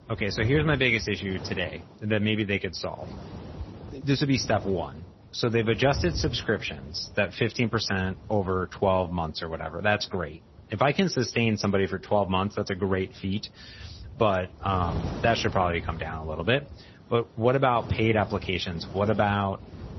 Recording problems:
garbled, watery; slightly; nothing above 6 kHz
wind noise on the microphone; occasional gusts; 20 dB below the speech

